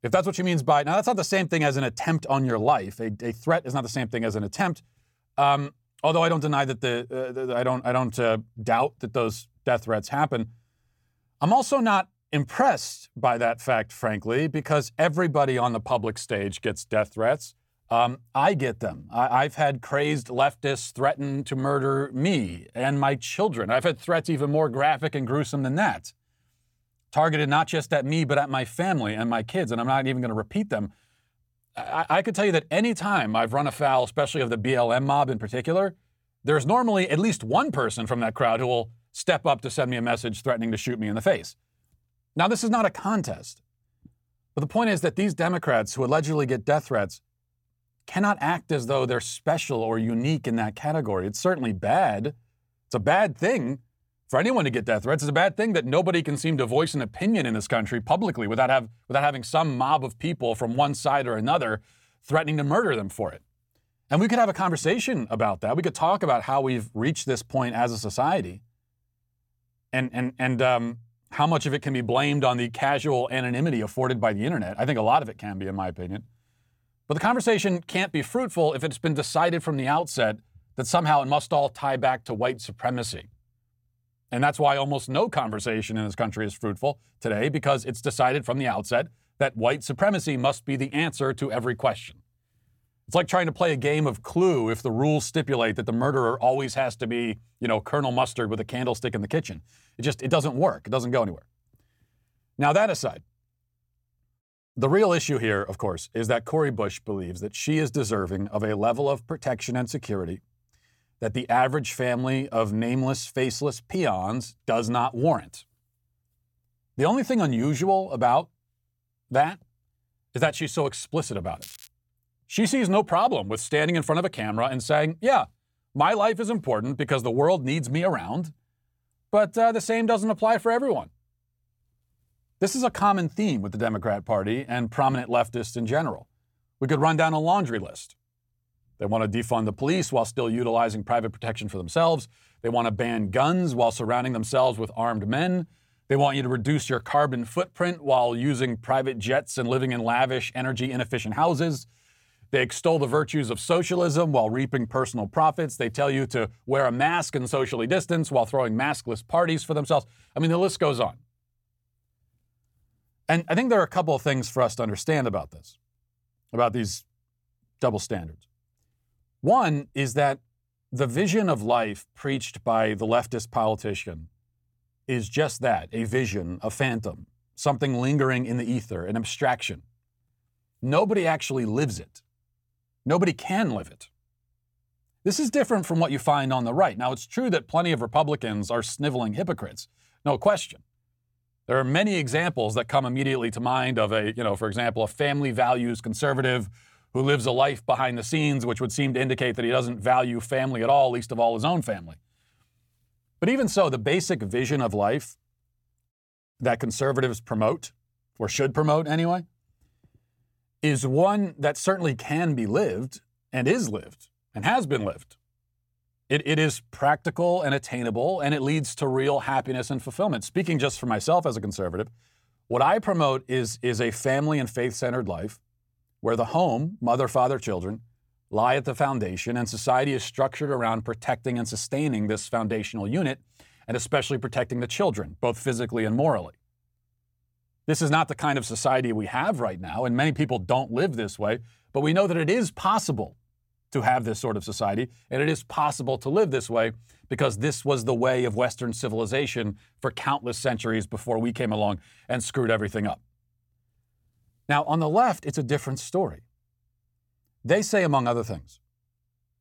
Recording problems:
crackling; noticeable; at 2:02, mostly in the pauses; 20 dB below the speech

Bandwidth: 17.5 kHz